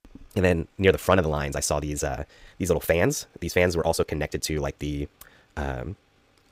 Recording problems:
wrong speed, natural pitch; too fast; 1.6 times normal speed

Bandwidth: 15.5 kHz